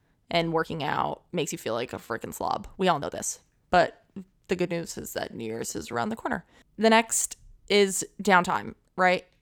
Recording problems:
uneven, jittery; strongly; from 0.5 to 8.5 s

